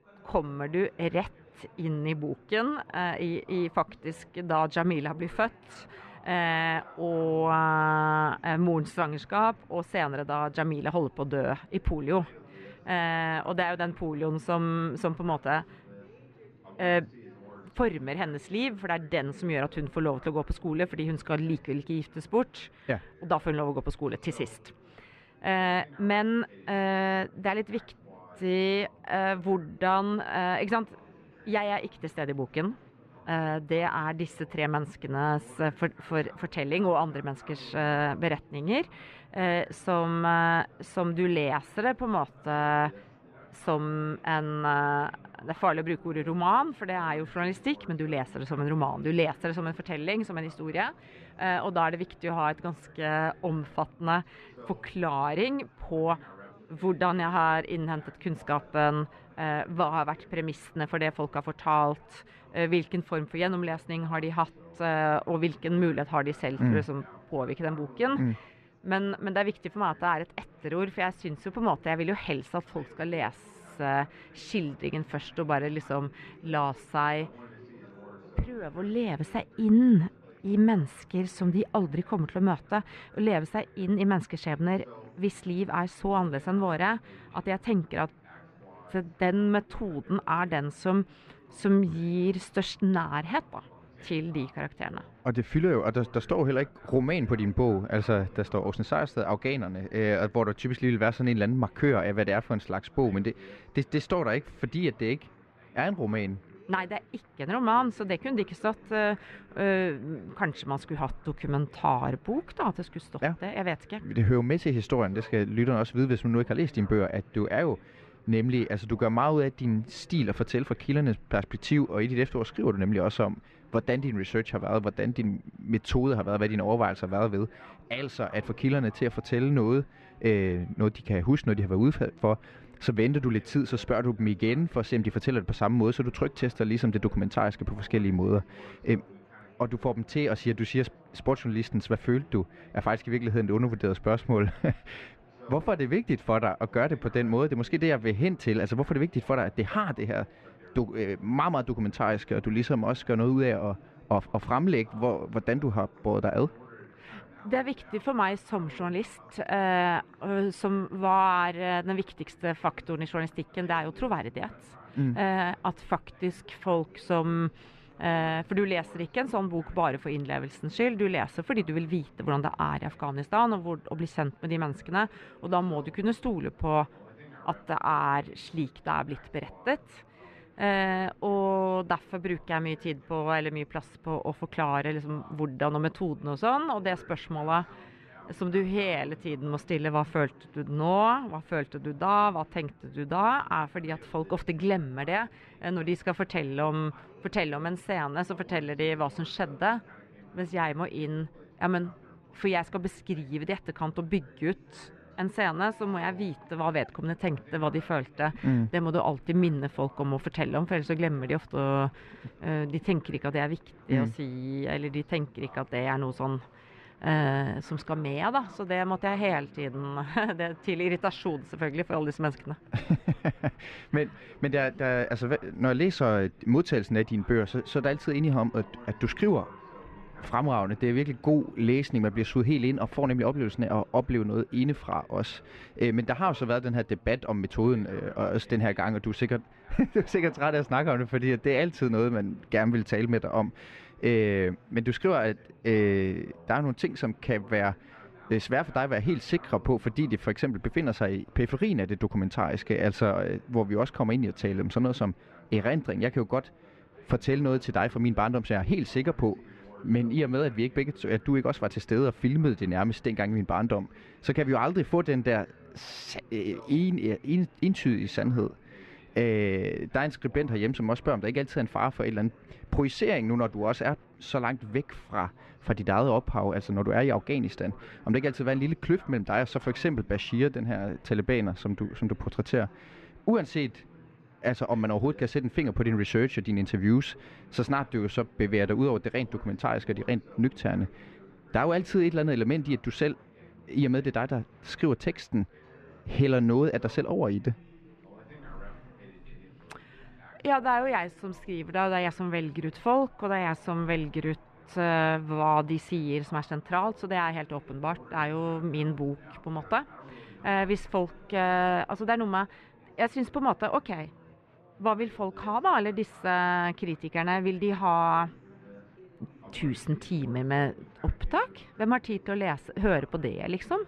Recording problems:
muffled; slightly; fading above 2.5 kHz
chatter from many people; faint; throughout; 25 dB below the speech

